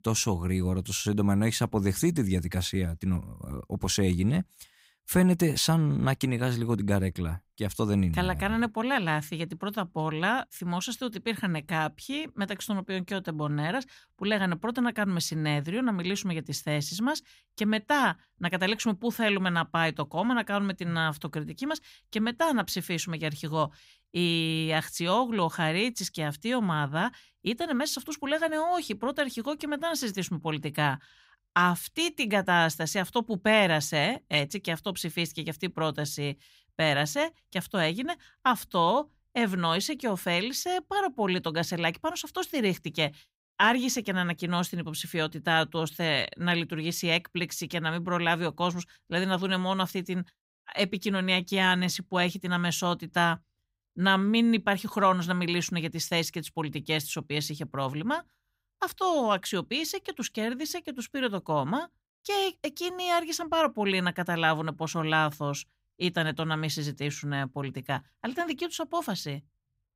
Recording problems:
none

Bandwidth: 15.5 kHz